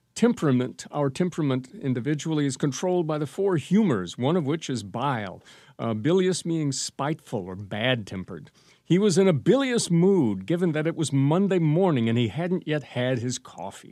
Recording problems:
none

